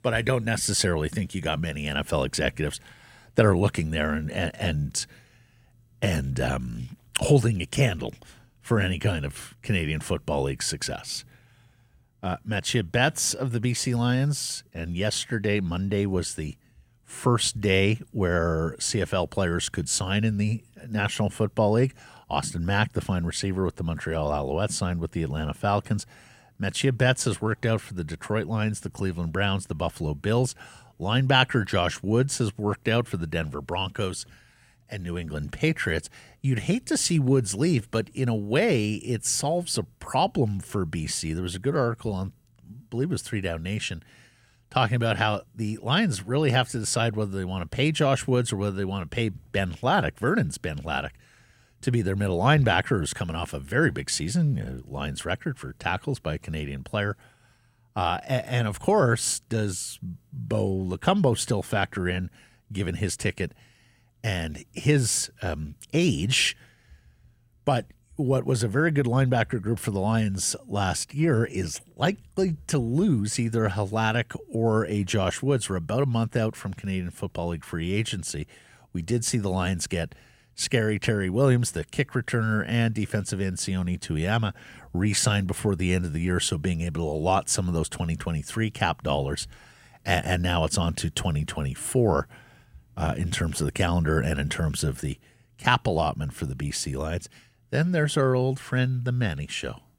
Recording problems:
none

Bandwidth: 16.5 kHz